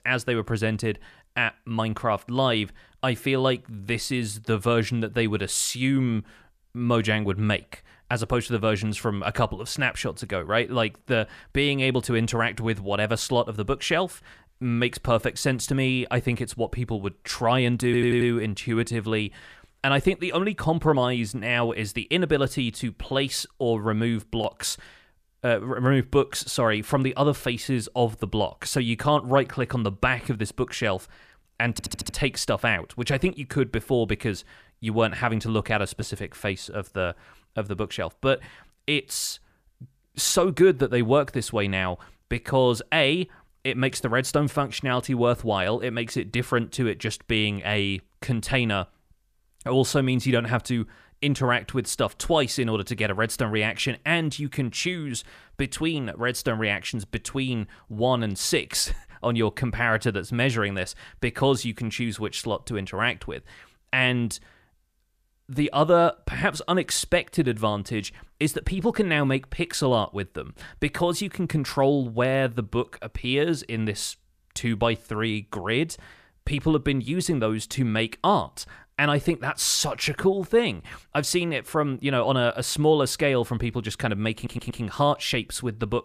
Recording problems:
audio stuttering; at 18 s, at 32 s and at 1:24

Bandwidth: 14.5 kHz